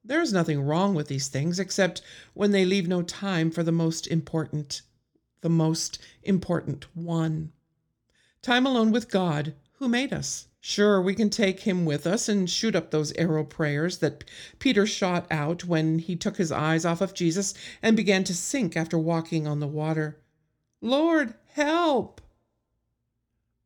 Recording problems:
none

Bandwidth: 18 kHz